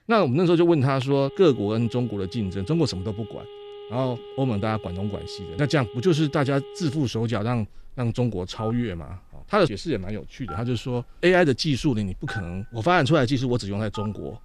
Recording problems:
alarms or sirens; noticeable; throughout; 15 dB below the speech

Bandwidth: 14.5 kHz